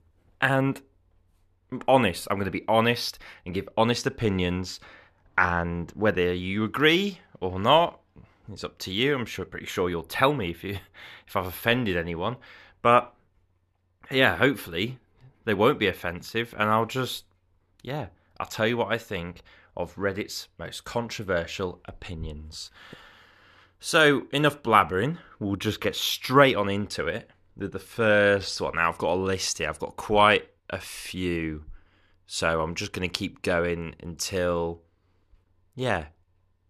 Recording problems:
none

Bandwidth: 13.5 kHz